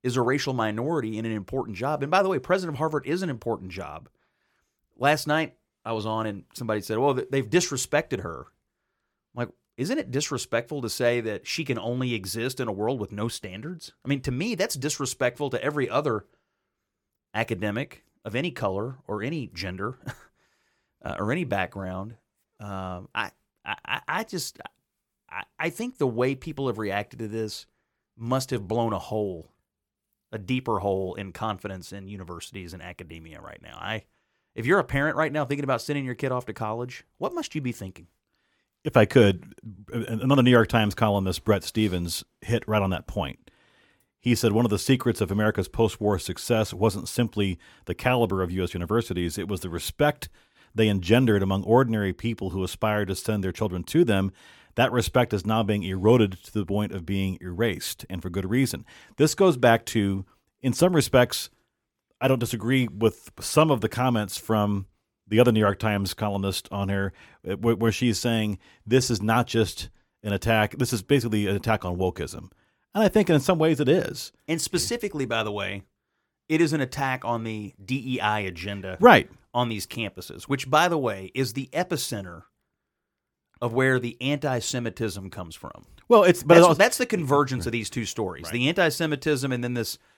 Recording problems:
none

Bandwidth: 17.5 kHz